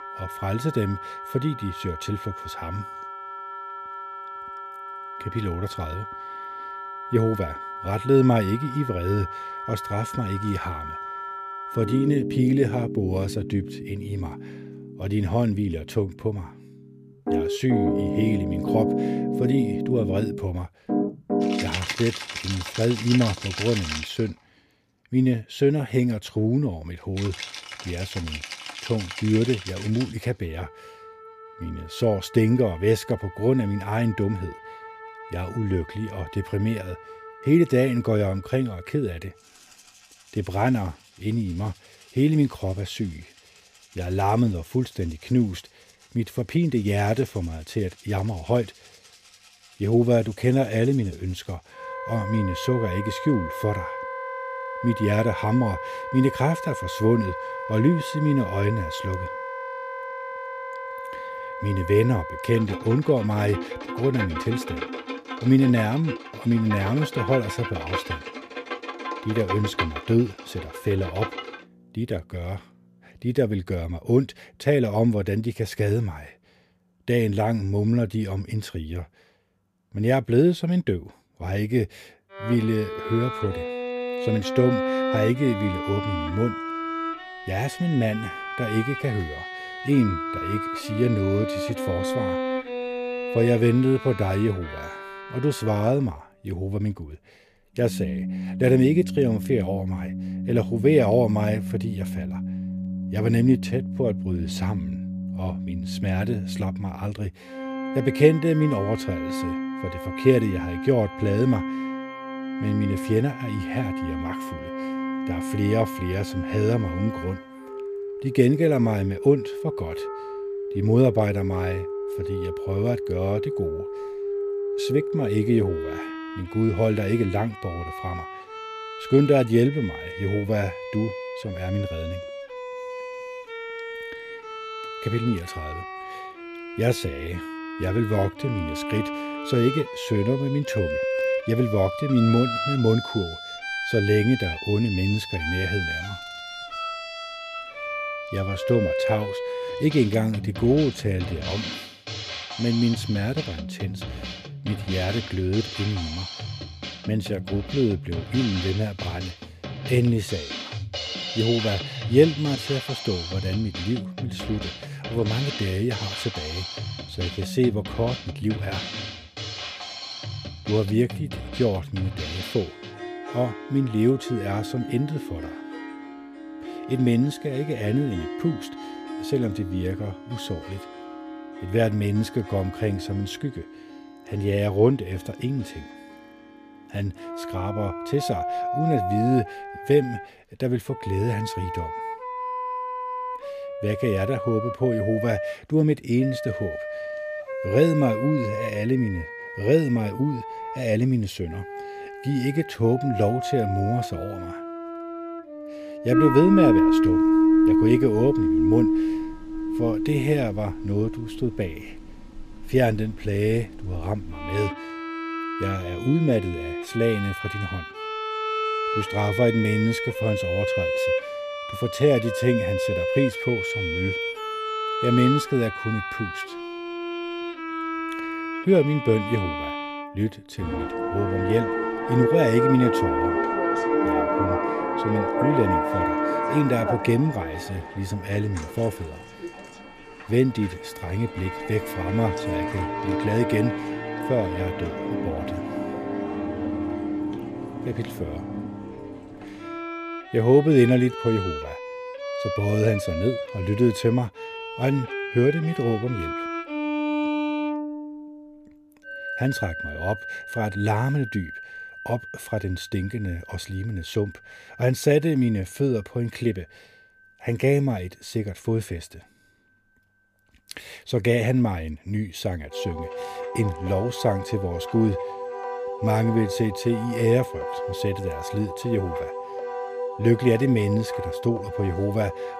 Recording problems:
background music; loud; throughout; 5 dB below the speech

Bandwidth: 14.5 kHz